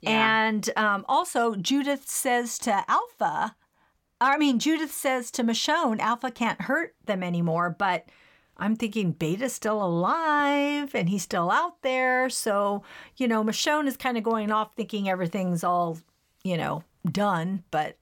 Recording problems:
none

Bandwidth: 17.5 kHz